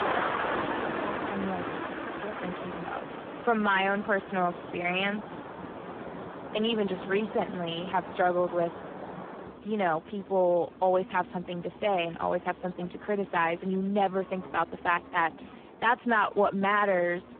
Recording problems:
phone-call audio; poor line
traffic noise; loud; throughout; 9 dB below the speech

